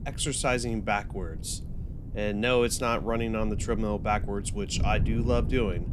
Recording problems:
wind noise on the microphone; occasional gusts; 15 dB below the speech

